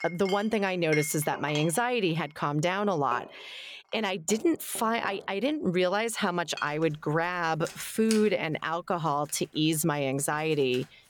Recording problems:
household noises; noticeable; throughout; 15 dB below the speech

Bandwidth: 18.5 kHz